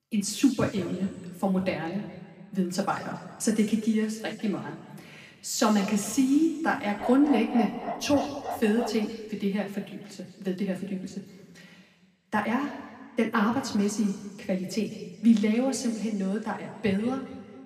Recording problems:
room echo; slight; dies away in 1.7 s
off-mic speech; somewhat distant
dog barking; noticeable; from 7 to 9 s; peak 6 dB below the speech

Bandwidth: 15 kHz